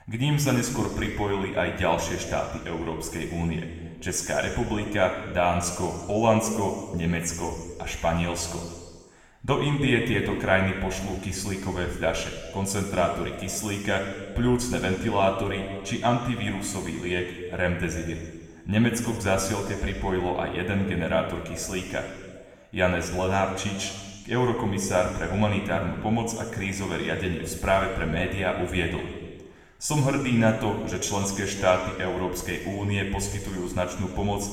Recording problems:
room echo; noticeable; dies away in 1.5 s
off-mic speech; somewhat distant

